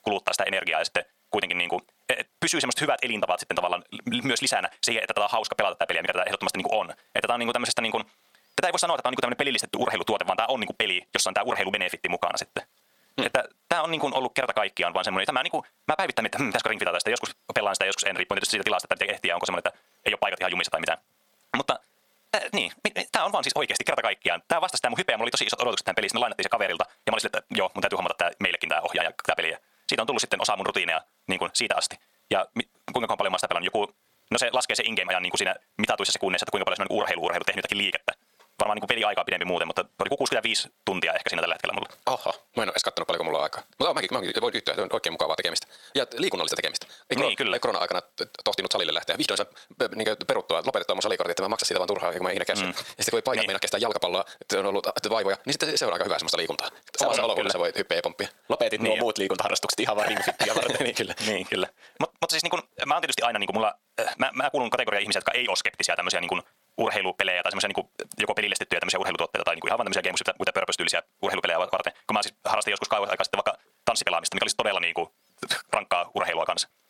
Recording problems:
wrong speed, natural pitch; too fast; 1.6 times normal speed
thin; somewhat; fading below 550 Hz
squashed, flat; somewhat

